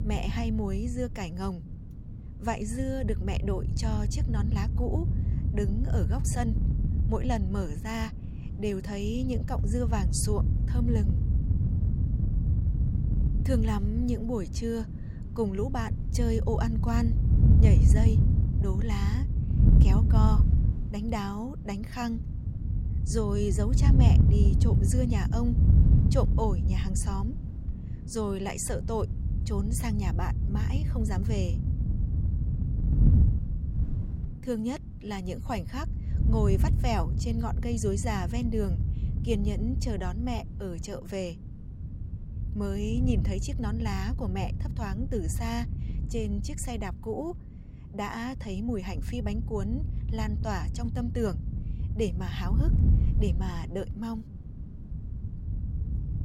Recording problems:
wind noise on the microphone; heavy; 6 dB below the speech

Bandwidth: 16 kHz